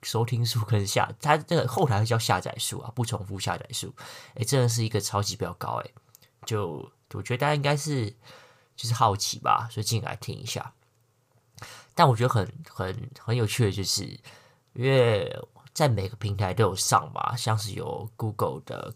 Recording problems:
none

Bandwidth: 15 kHz